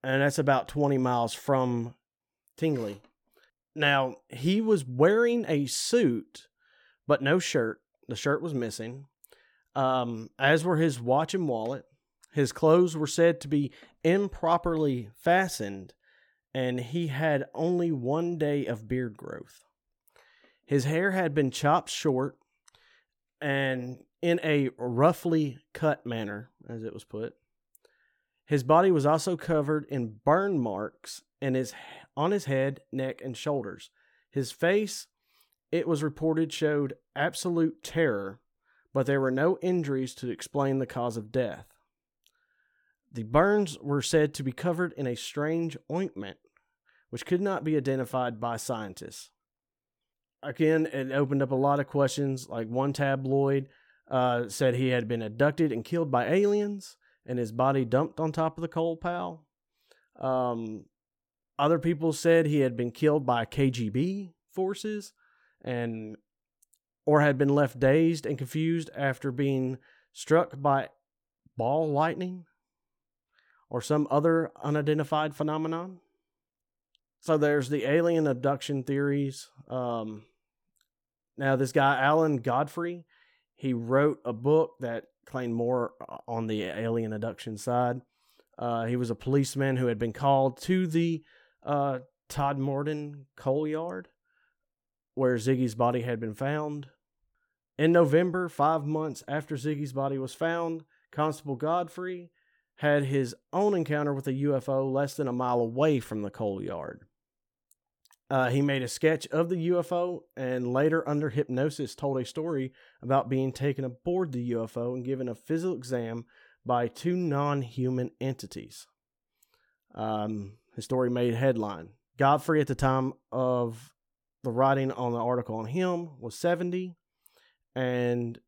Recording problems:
none

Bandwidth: 18 kHz